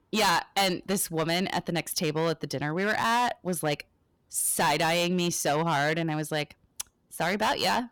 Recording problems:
distortion; heavy; 10% of the sound clipped

